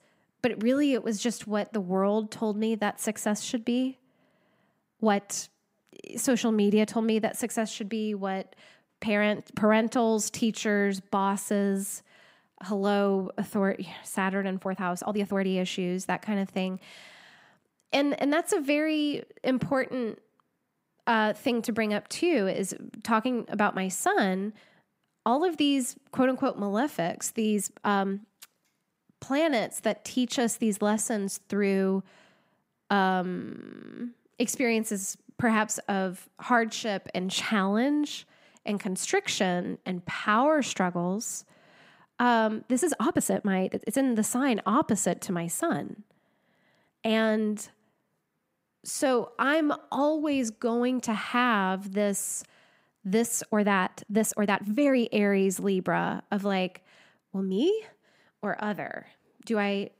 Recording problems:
uneven, jittery; strongly; from 5 to 58 s

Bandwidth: 15.5 kHz